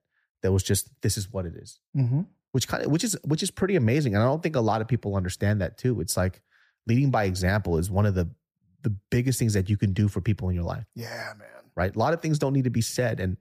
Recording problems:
none

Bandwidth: 14.5 kHz